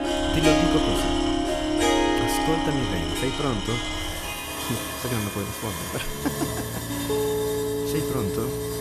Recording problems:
background music; very loud; throughout; 4 dB above the speech
machinery noise; loud; throughout; 1 dB below the speech

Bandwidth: 14.5 kHz